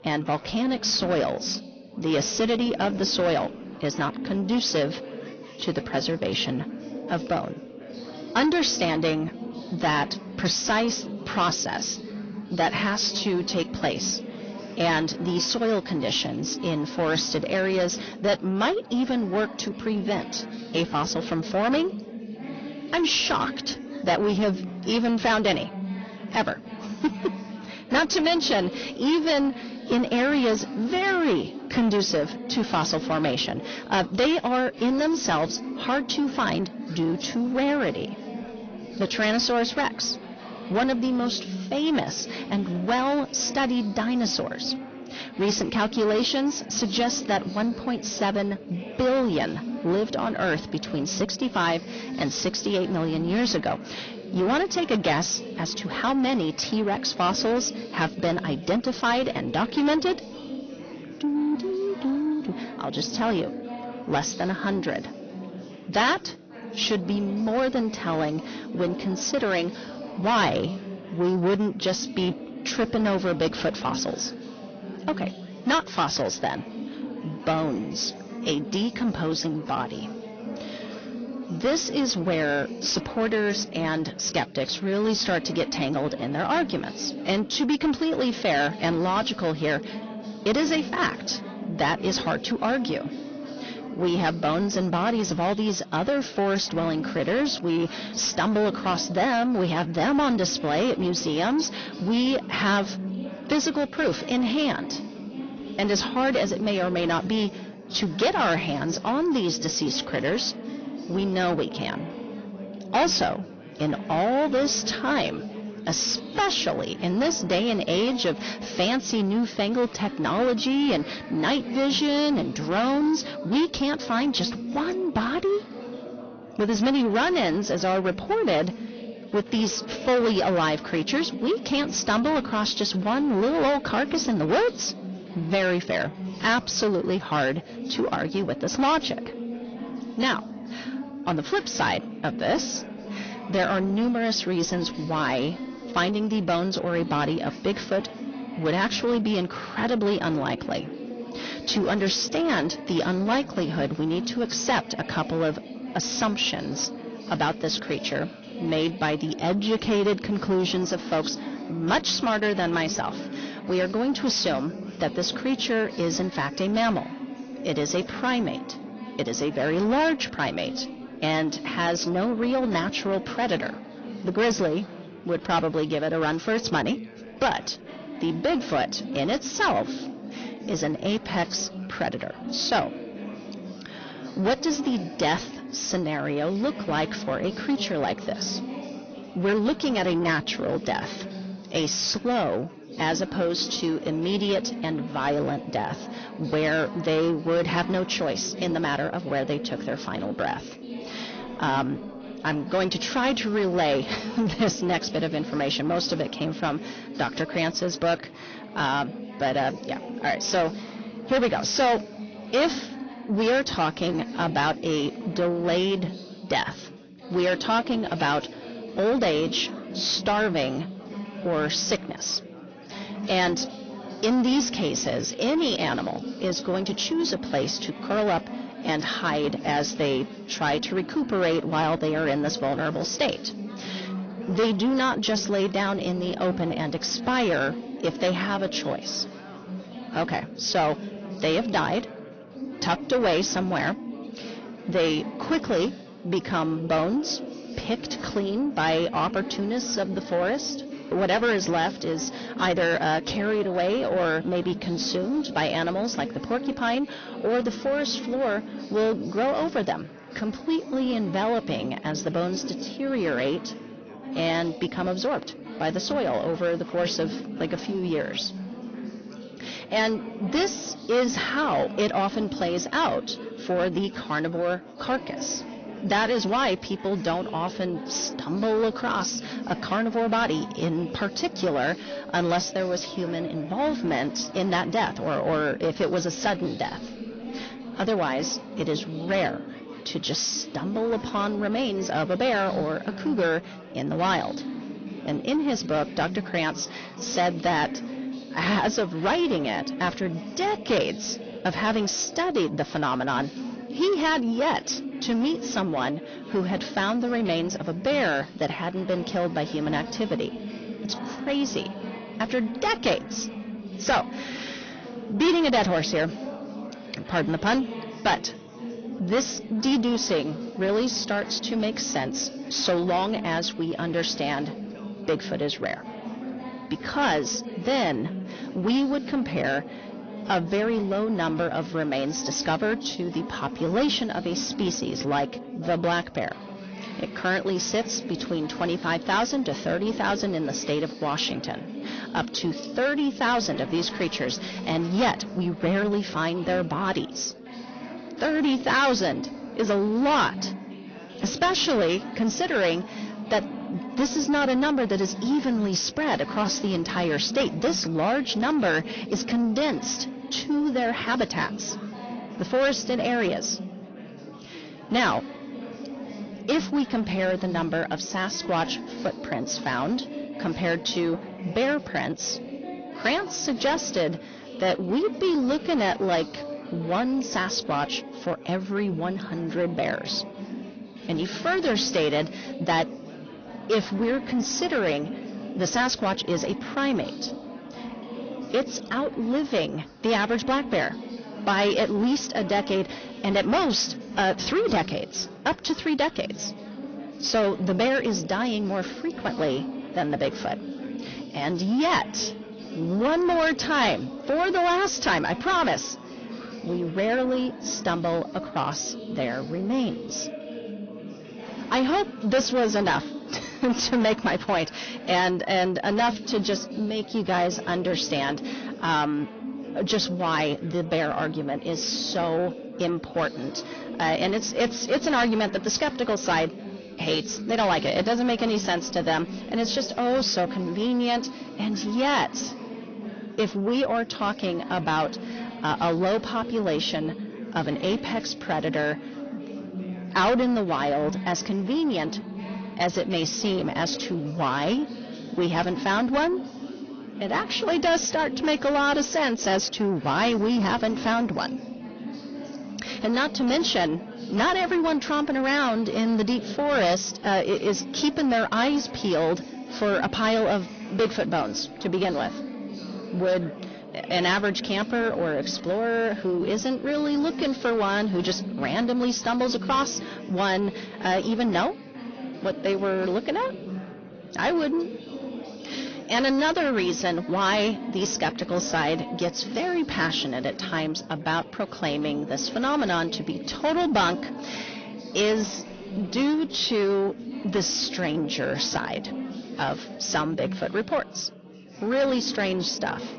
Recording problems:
distortion; heavy; 8 dB below the speech
high frequencies cut off; noticeable; nothing above 6.5 kHz
garbled, watery; slightly
chatter from many people; noticeable; throughout; 10 dB below the speech

